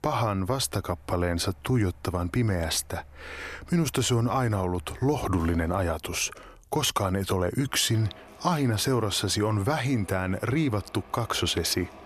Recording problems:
machinery noise; faint; throughout; 25 dB below the speech

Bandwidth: 13.5 kHz